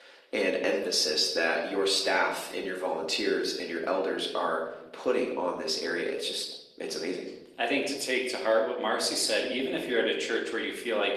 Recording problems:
thin; somewhat; fading below 300 Hz
room echo; slight; dies away in 0.8 s
off-mic speech; somewhat distant
garbled, watery; slightly; nothing above 13.5 kHz

